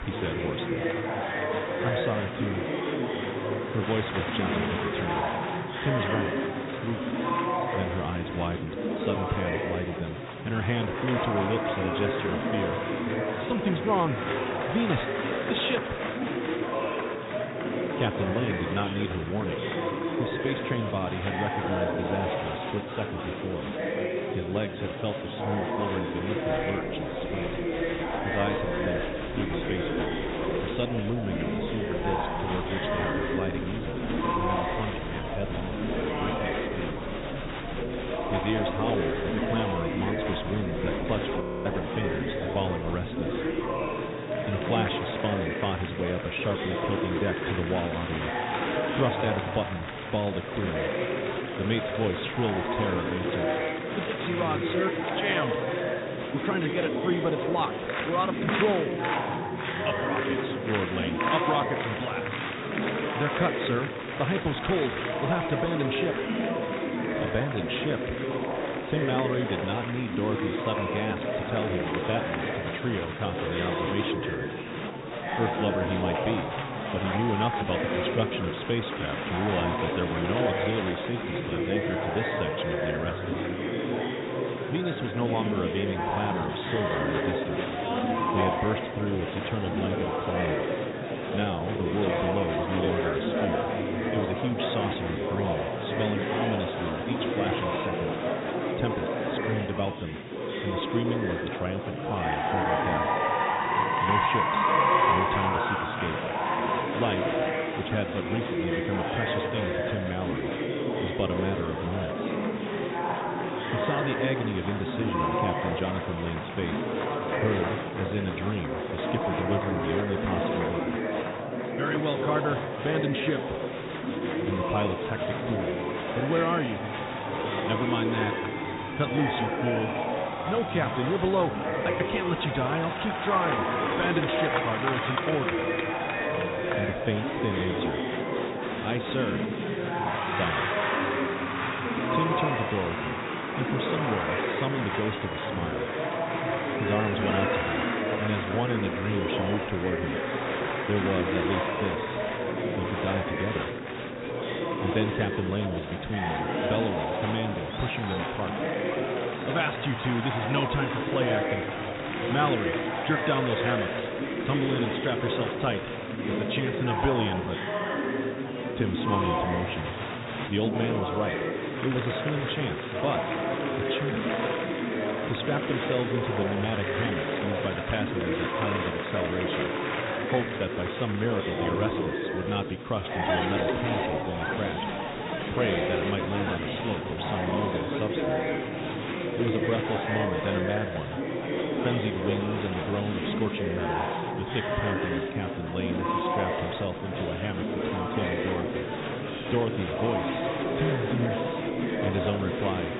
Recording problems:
high frequencies cut off; severe; nothing above 4 kHz
murmuring crowd; very loud; throughout; 2 dB above the speech
audio freezing; at 41 s

